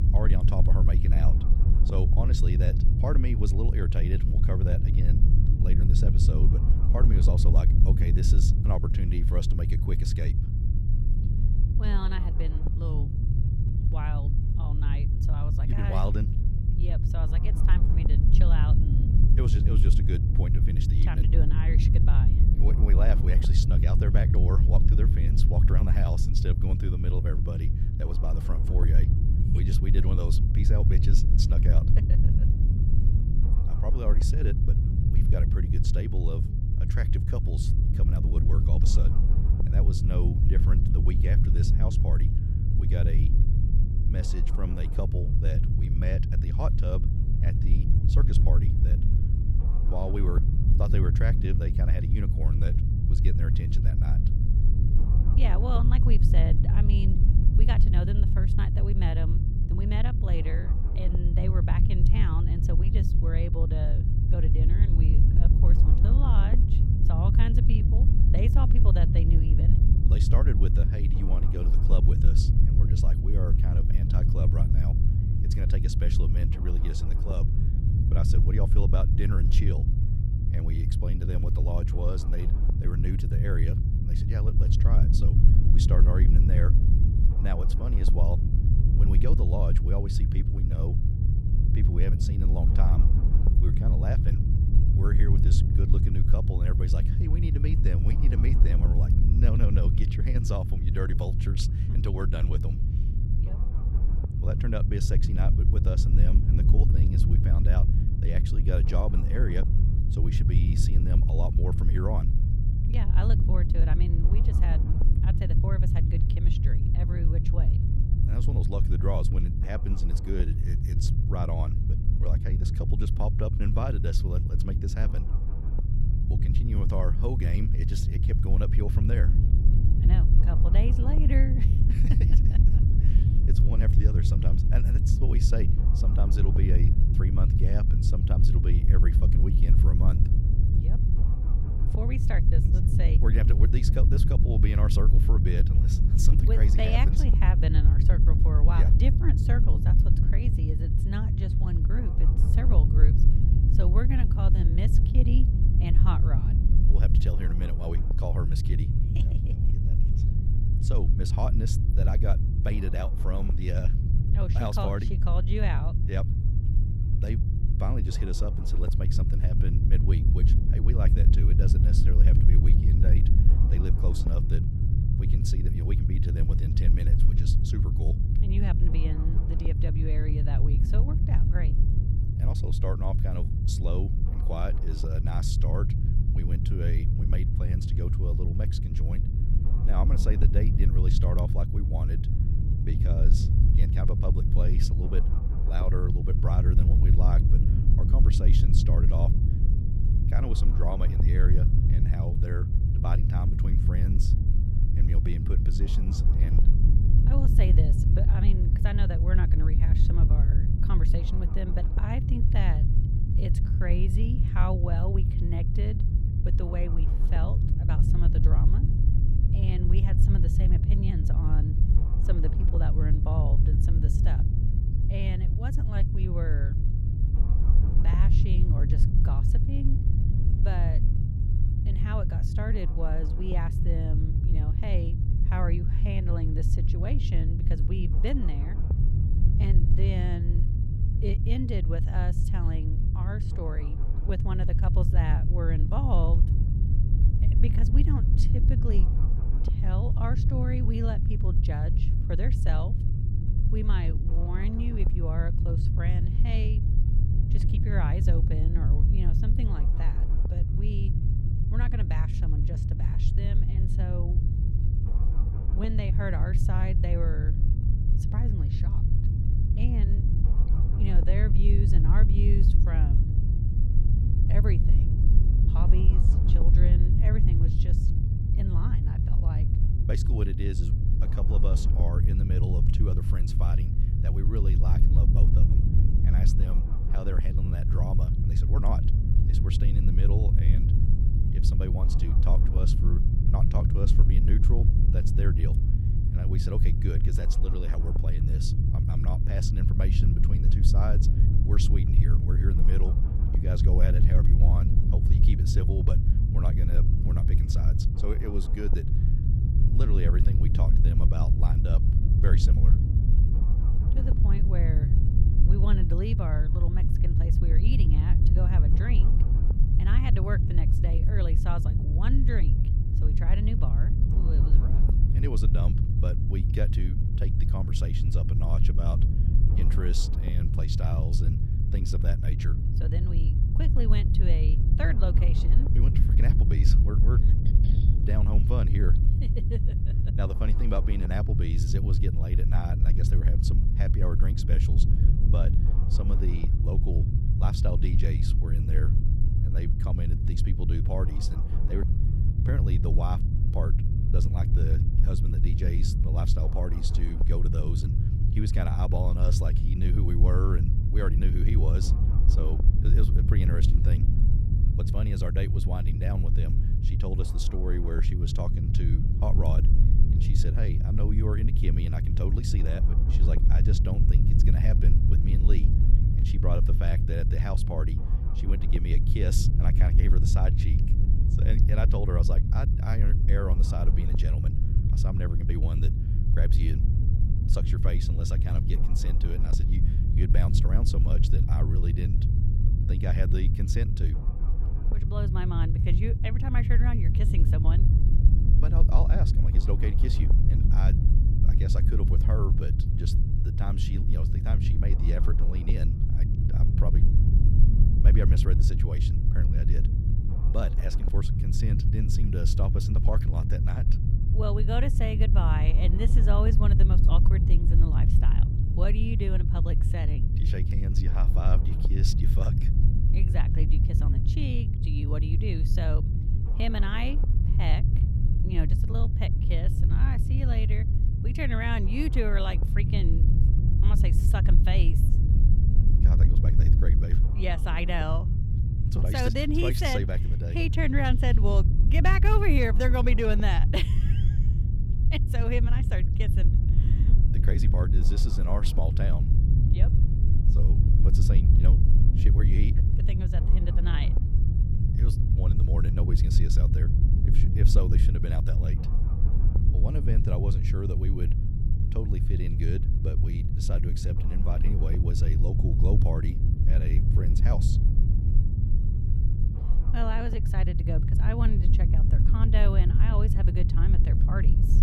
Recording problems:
low rumble; loud; throughout; 1 dB below the speech

